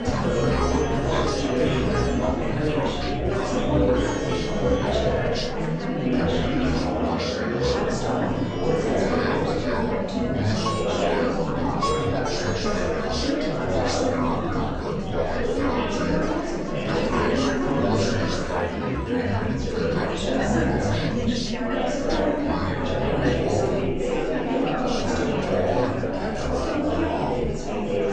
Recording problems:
off-mic speech; far
wrong speed and pitch; too slow and too low; 0.6 times normal speed
room echo; slight; dies away in 0.4 s
chatter from many people; very loud; throughout; 4 dB above the speech
background music; loud; throughout; 7 dB below the speech
rain or running water; noticeable; throughout; 10 dB below the speech

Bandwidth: 9.5 kHz